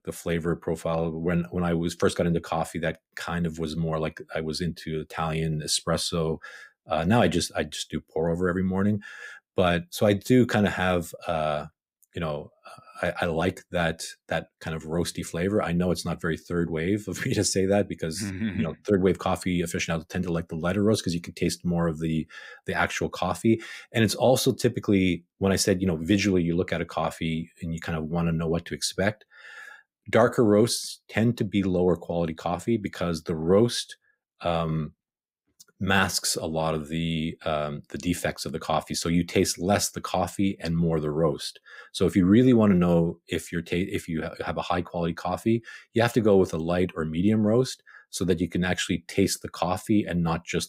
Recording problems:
none

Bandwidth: 15.5 kHz